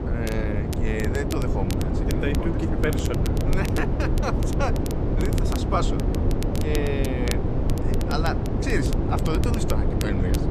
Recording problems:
wind noise on the microphone; heavy; 1 dB below the speech
crackle, like an old record; noticeable; 10 dB below the speech

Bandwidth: 14.5 kHz